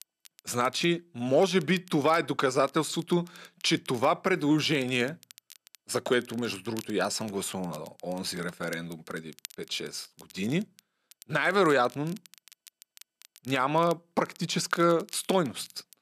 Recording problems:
crackle, like an old record; faint; 25 dB below the speech

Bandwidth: 14 kHz